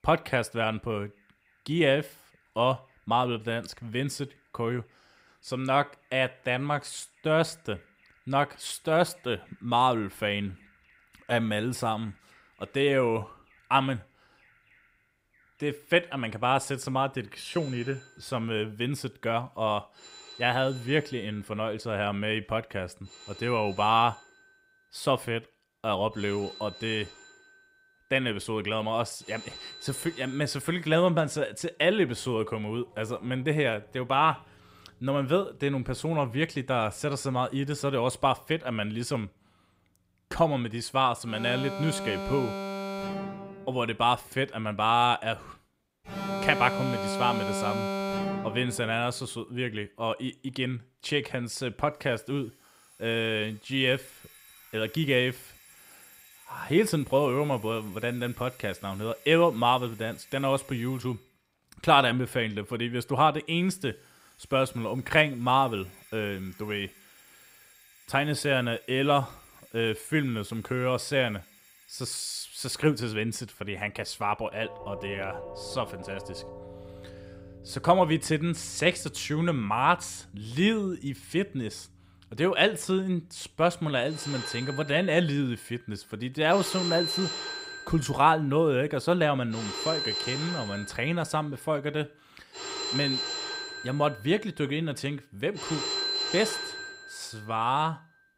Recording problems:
alarms or sirens; loud; throughout; 8 dB below the speech

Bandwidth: 15.5 kHz